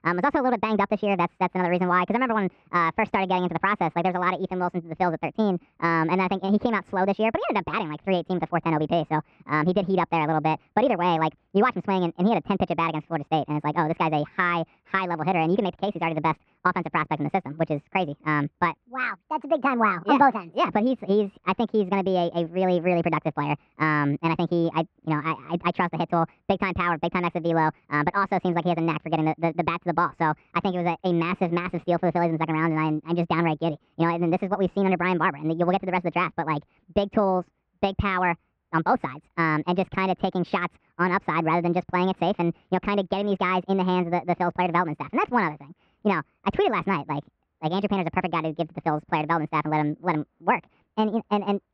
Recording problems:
muffled; very; fading above 2 kHz
wrong speed and pitch; too fast and too high; 1.5 times normal speed

